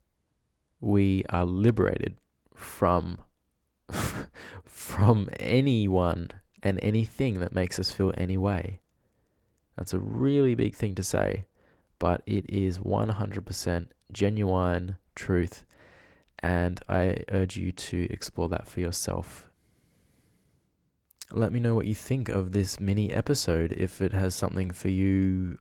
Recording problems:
garbled, watery; slightly; nothing above 18 kHz

